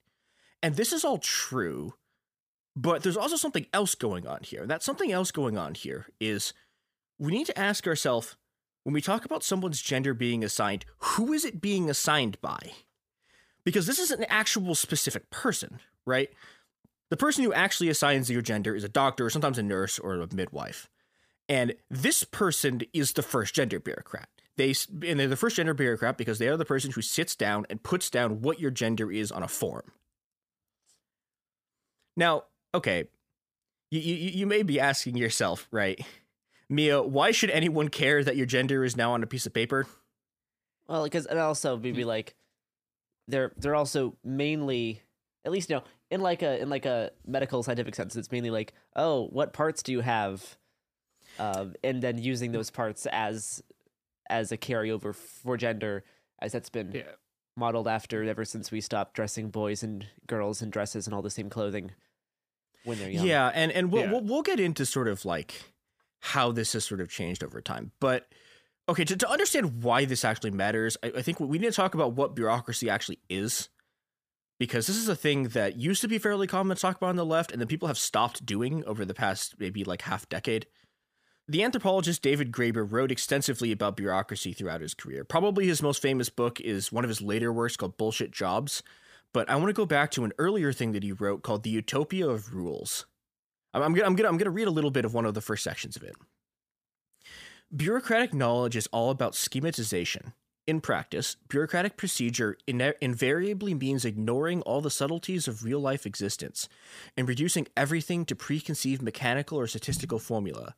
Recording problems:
none

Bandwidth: 15 kHz